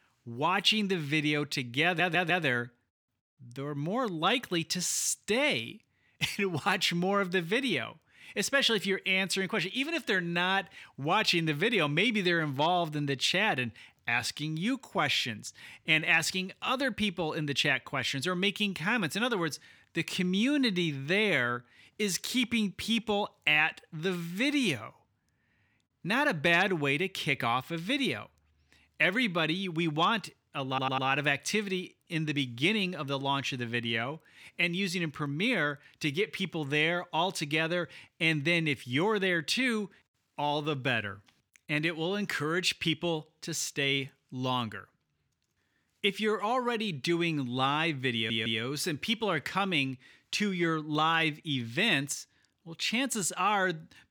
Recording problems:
audio stuttering; at 2 s, at 31 s and at 48 s

